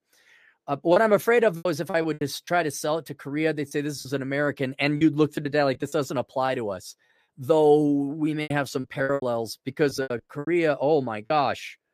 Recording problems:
choppy; very; 10% of the speech affected

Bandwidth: 14.5 kHz